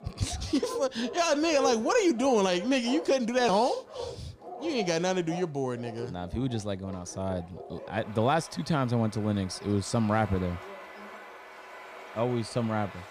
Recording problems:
animal sounds; noticeable; throughout; 15 dB below the speech

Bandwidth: 15 kHz